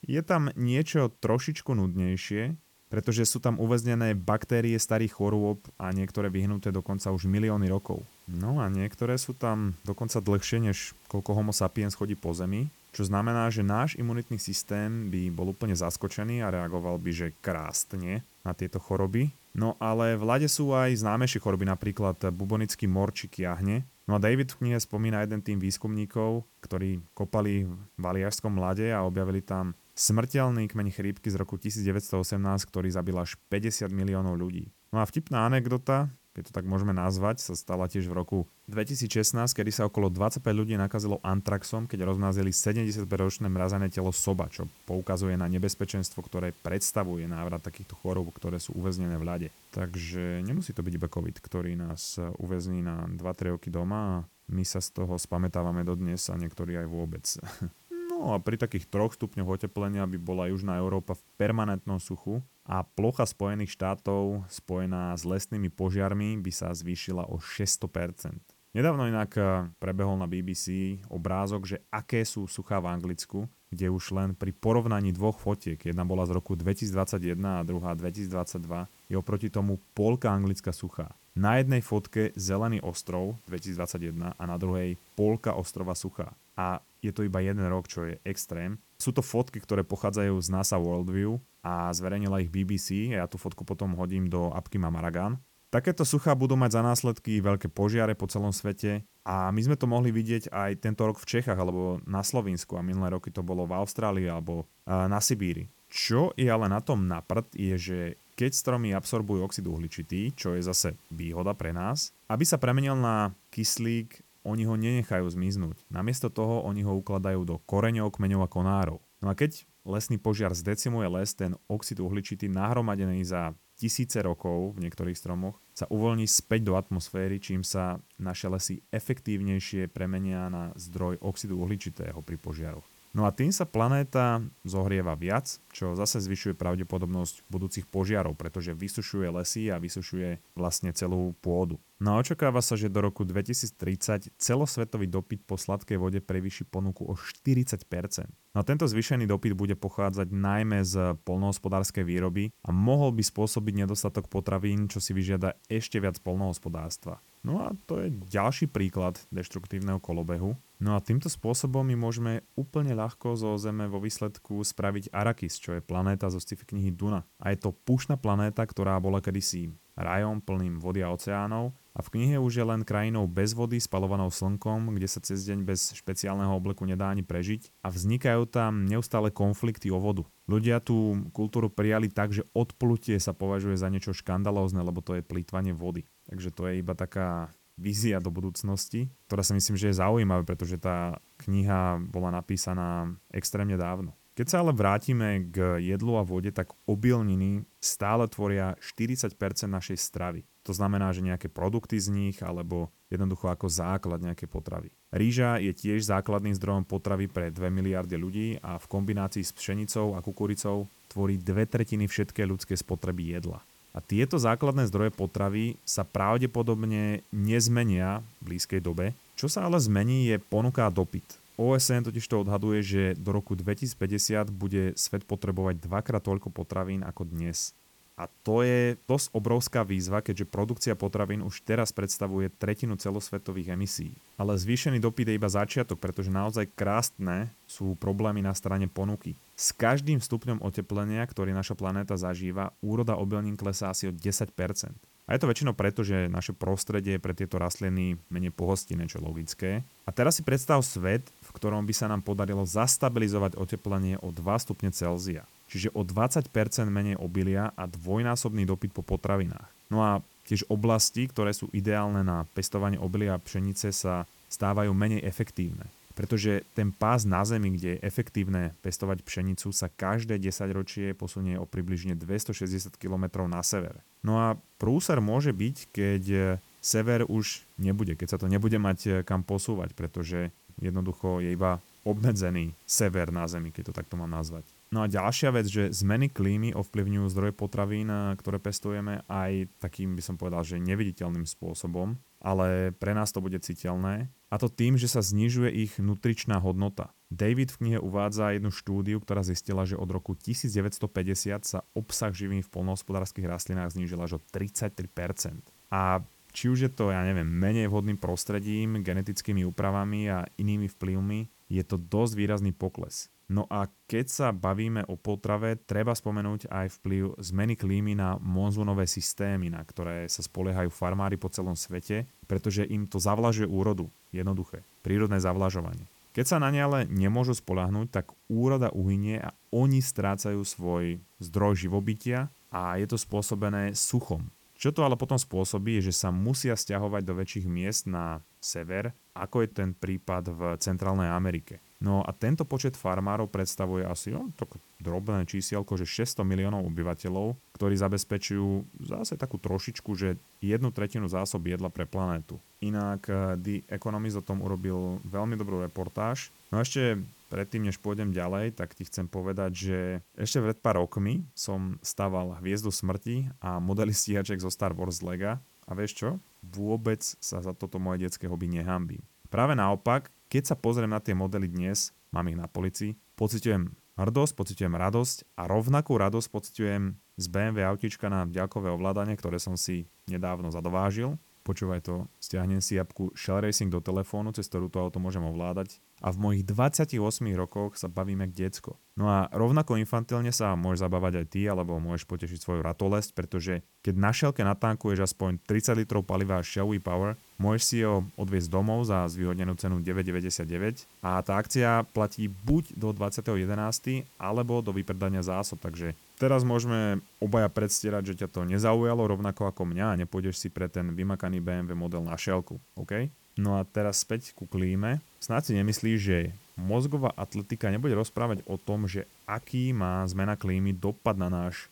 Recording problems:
hiss; faint; throughout; 30 dB below the speech

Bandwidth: 18 kHz